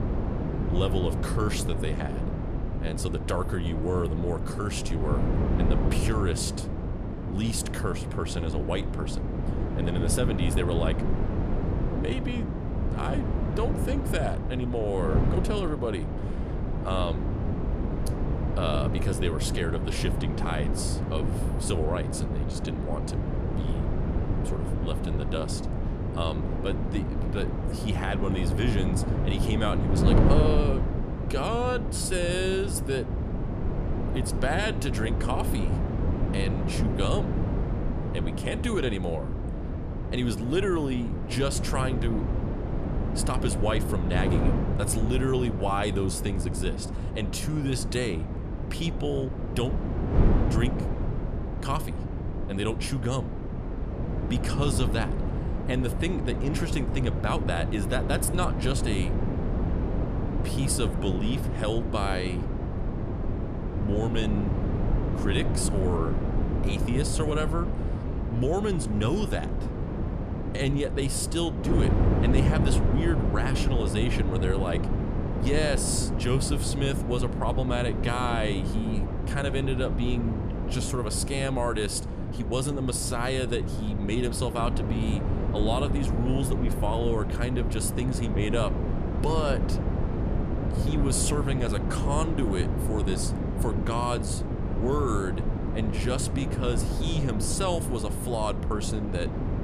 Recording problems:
wind noise on the microphone; heavy; 4 dB below the speech

